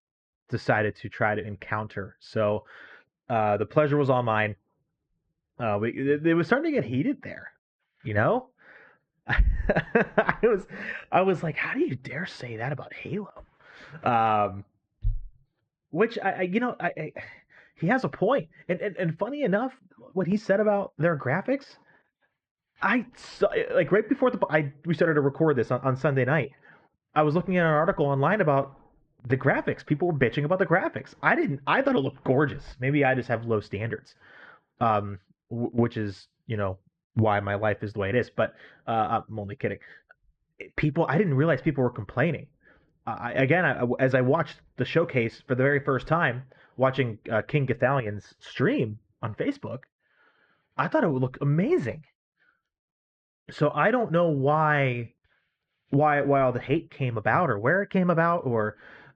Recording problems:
muffled; very; fading above 2.5 kHz

